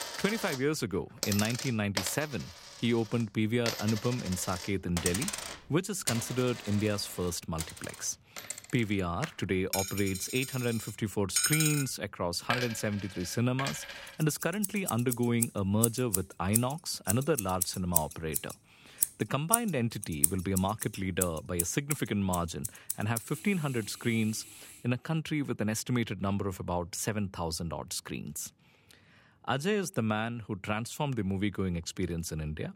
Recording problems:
household noises; loud; until 25 s; 2 dB below the speech

